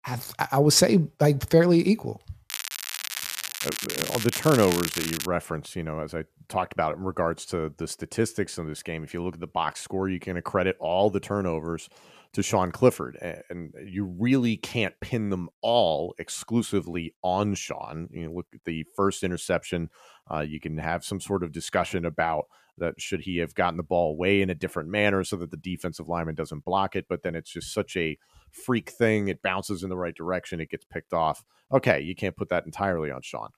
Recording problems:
crackling; loud; from 2.5 to 5.5 s; 4 dB below the speech

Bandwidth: 14.5 kHz